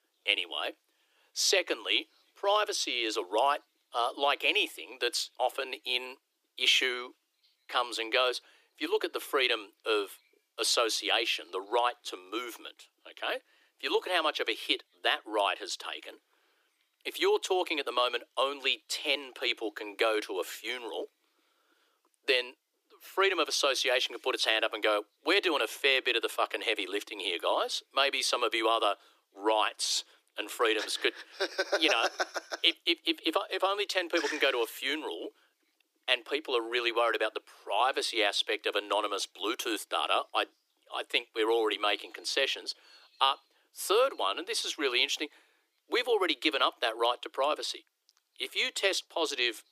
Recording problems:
thin; very; fading below 300 Hz

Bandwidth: 15 kHz